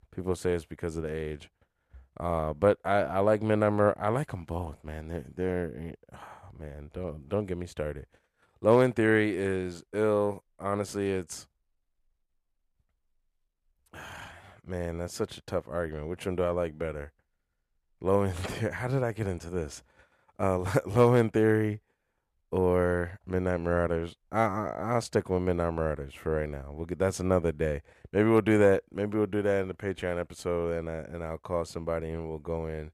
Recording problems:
none

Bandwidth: 14.5 kHz